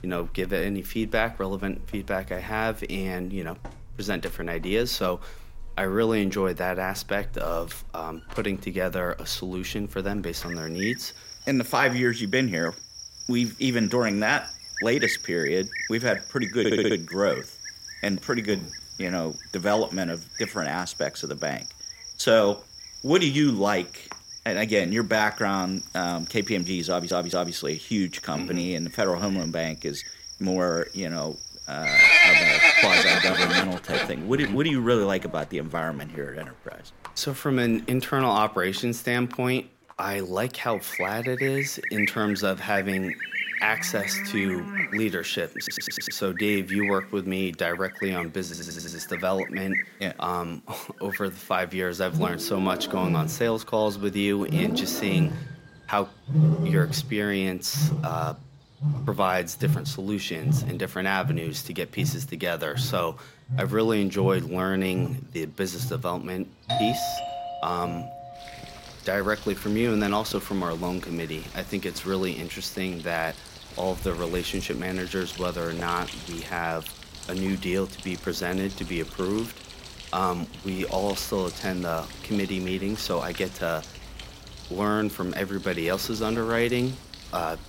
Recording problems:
animal sounds; very loud; throughout; as loud as the speech
audio stuttering; 4 times, first at 17 s
doorbell; loud; from 1:07 to 1:08; peak 1 dB above the speech

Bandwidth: 16 kHz